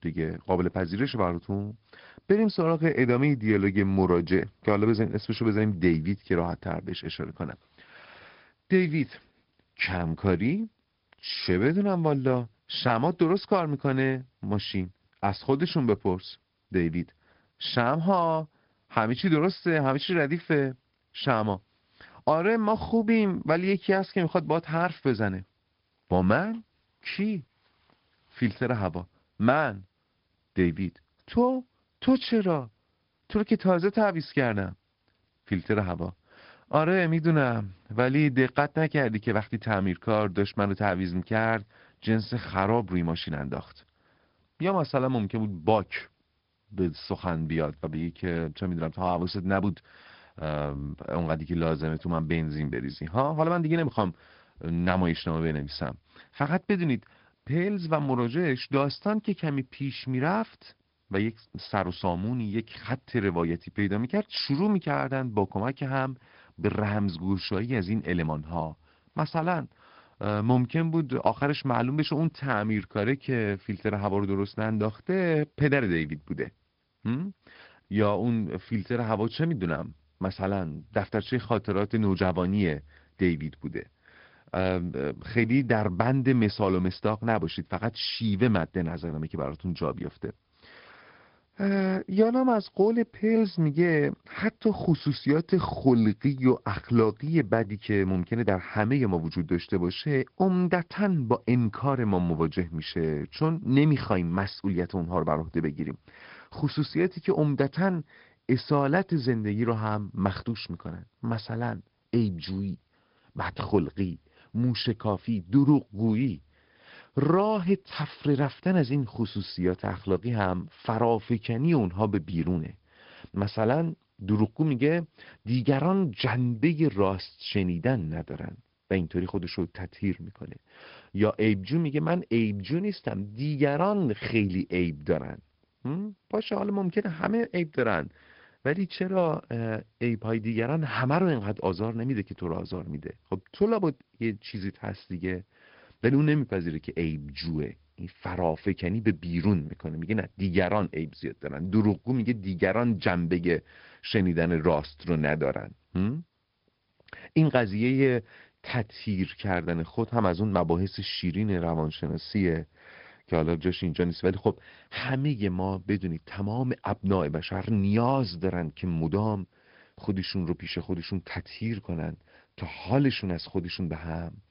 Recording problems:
high frequencies cut off; noticeable; nothing above 5 kHz
garbled, watery; slightly

